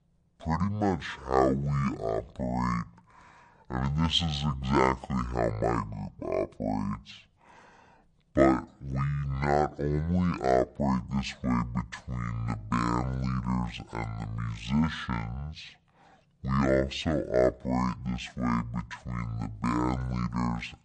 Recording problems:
wrong speed and pitch; too slow and too low; 0.5 times normal speed

